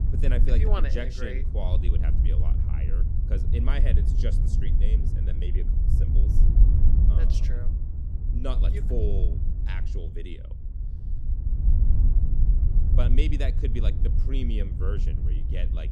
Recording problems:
wind noise on the microphone; heavy; 4 dB below the speech

